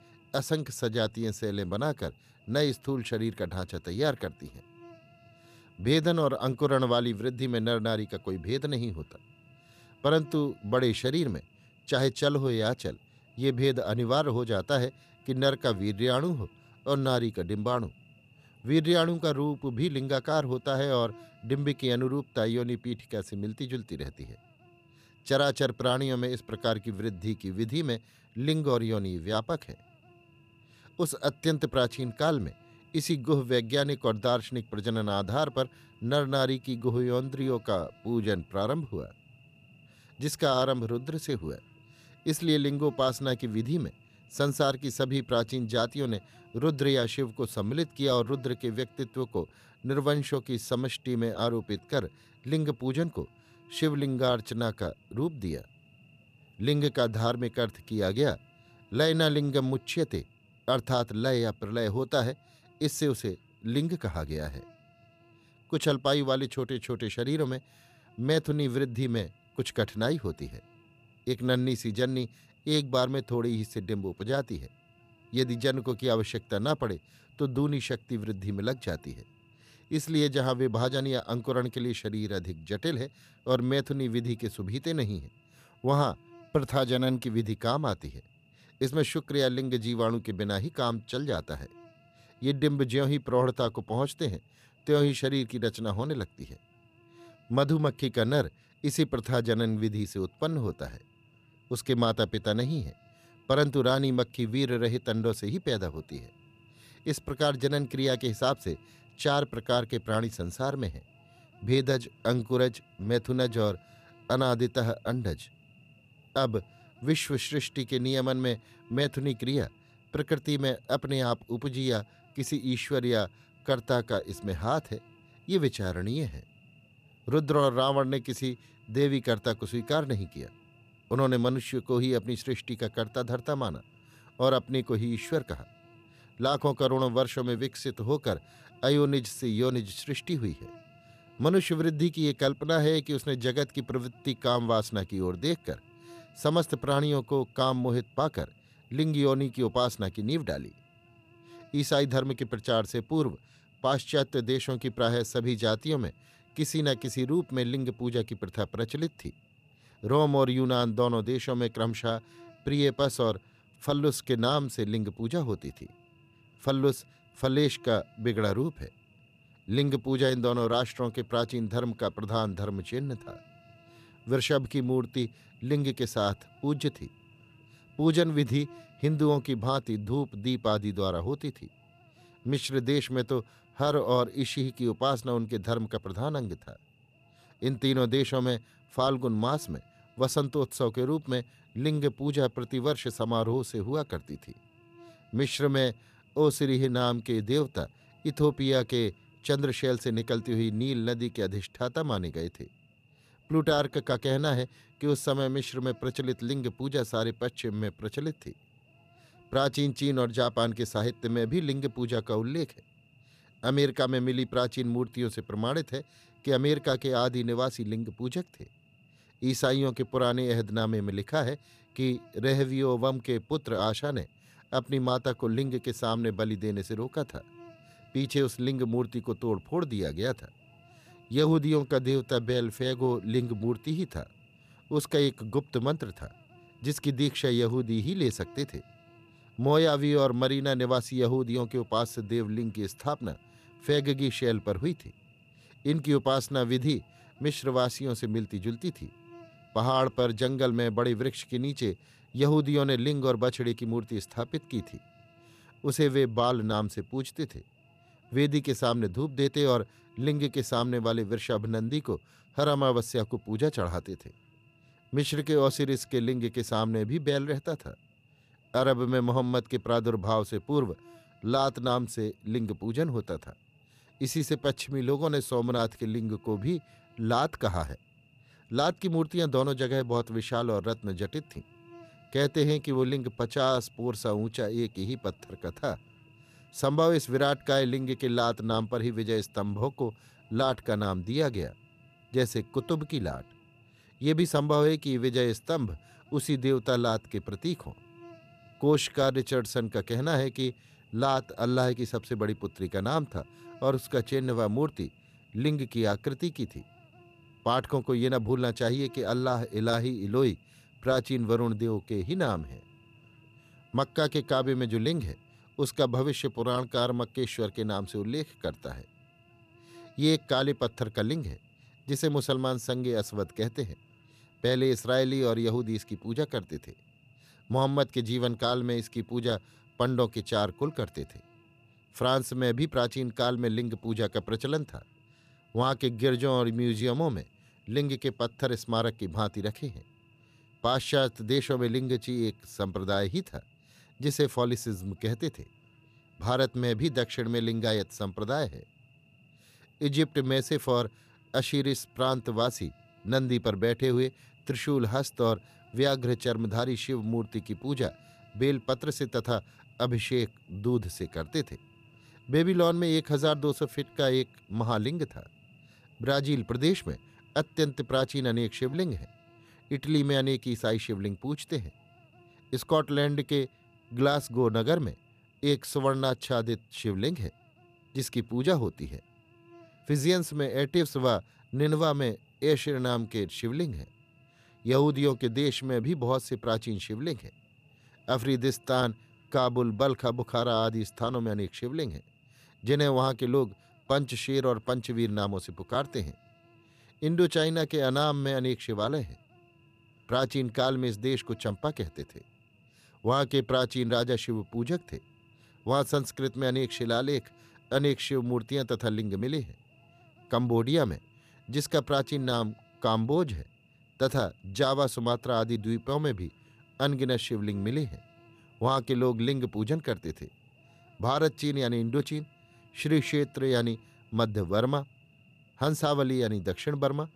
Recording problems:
electrical hum; faint; throughout; 60 Hz, 30 dB below the speech

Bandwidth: 14.5 kHz